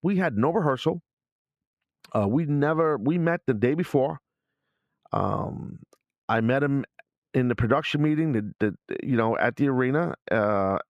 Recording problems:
muffled; slightly; fading above 4 kHz

